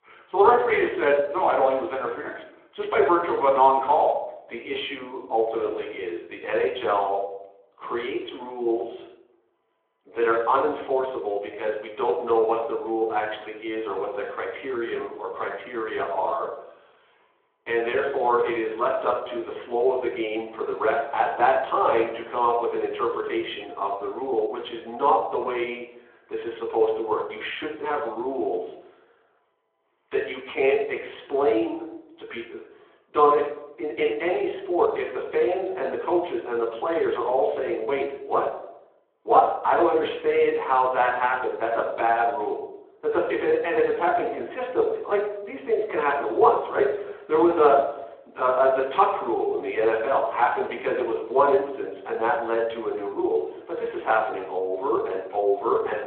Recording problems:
room echo; slight; dies away in 0.8 s
phone-call audio
off-mic speech; somewhat distant

